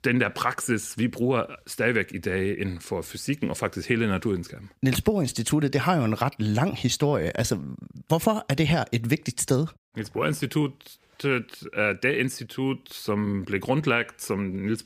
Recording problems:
none

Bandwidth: 15 kHz